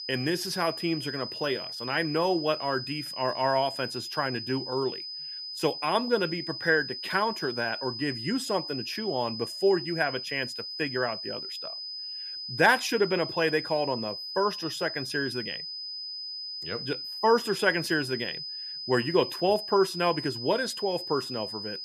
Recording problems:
high-pitched whine; loud; throughout; 5 kHz, 6 dB below the speech

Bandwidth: 14.5 kHz